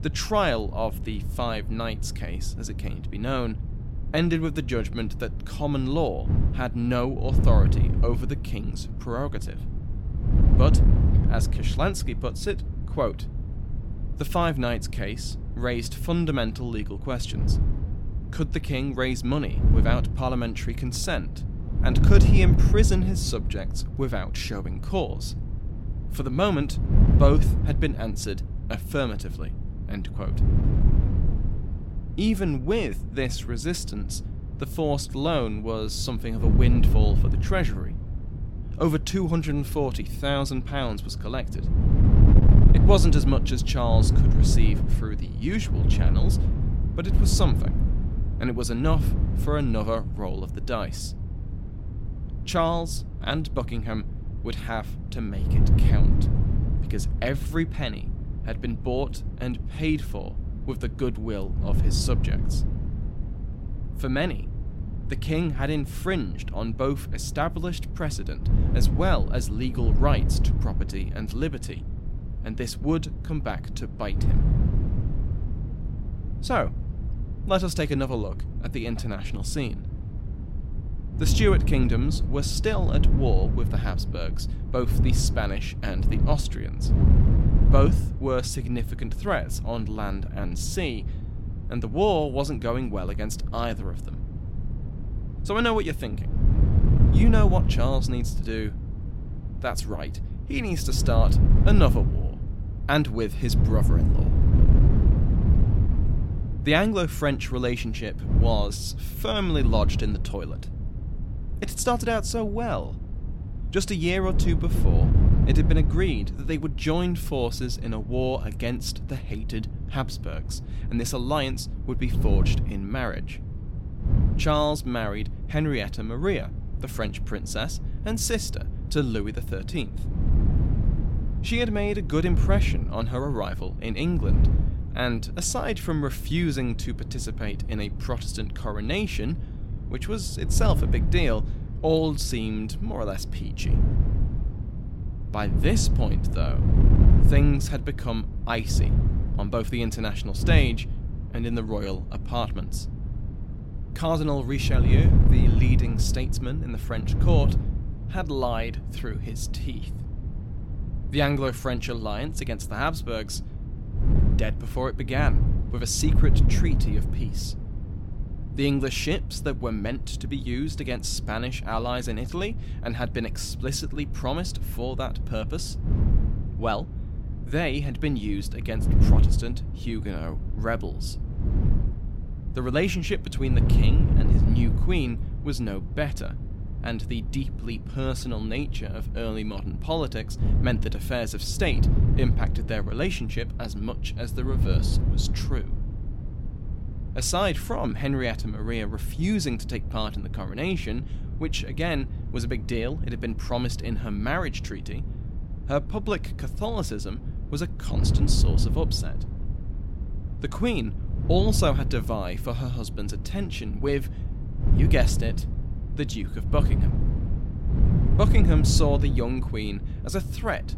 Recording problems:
wind noise on the microphone; heavy; 10 dB below the speech

